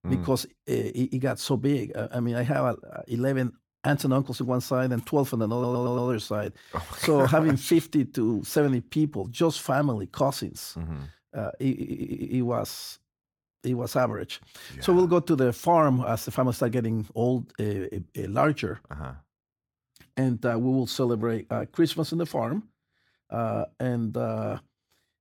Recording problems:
audio stuttering; at 5.5 s and at 12 s

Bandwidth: 17.5 kHz